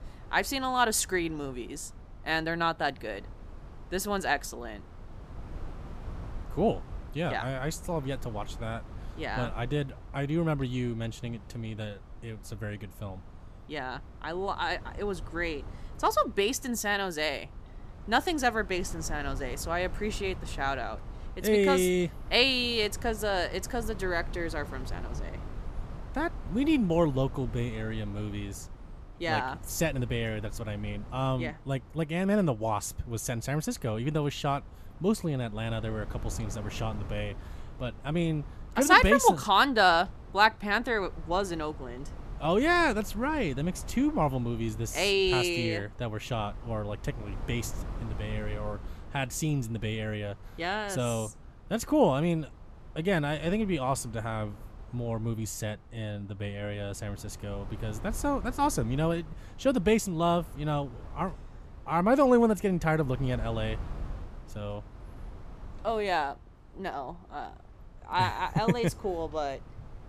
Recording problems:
wind noise on the microphone; occasional gusts; 25 dB below the speech

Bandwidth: 14.5 kHz